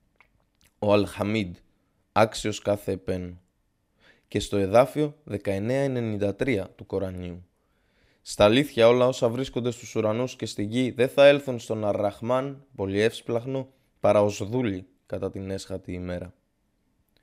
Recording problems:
none

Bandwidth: 15.5 kHz